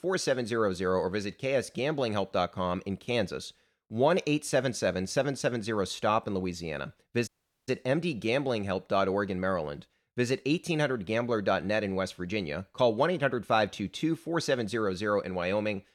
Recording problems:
audio cutting out; at 7.5 s

